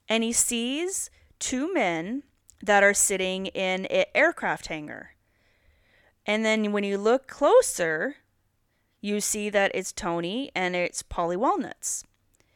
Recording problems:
none

